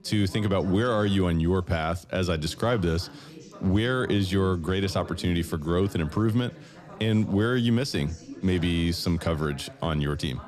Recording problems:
background chatter; noticeable; throughout; 3 voices, 20 dB below the speech

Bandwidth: 13.5 kHz